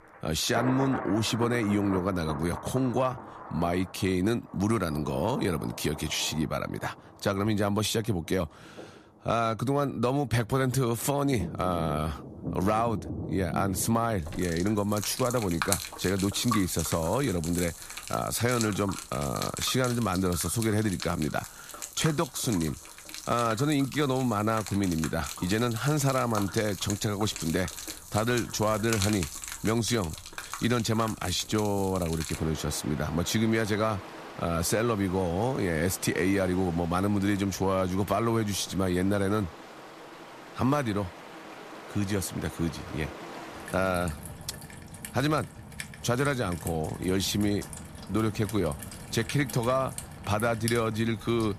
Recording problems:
rain or running water; noticeable; throughout; 10 dB below the speech

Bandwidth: 14.5 kHz